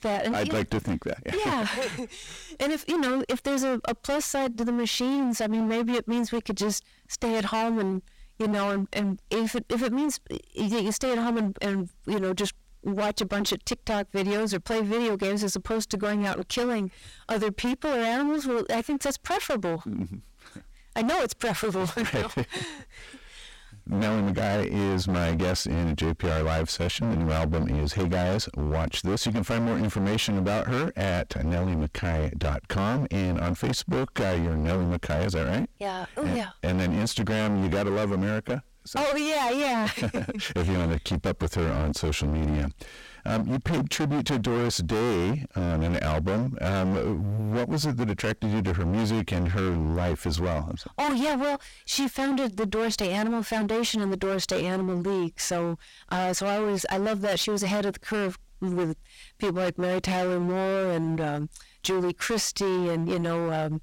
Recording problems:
distortion; heavy; 29% of the sound clipped

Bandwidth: 16.5 kHz